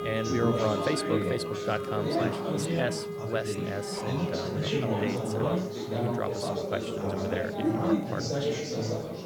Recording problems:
chatter from many people; very loud; throughout; 3 dB above the speech
background music; loud; throughout; 3 dB below the speech
hiss; faint; throughout; 25 dB below the speech

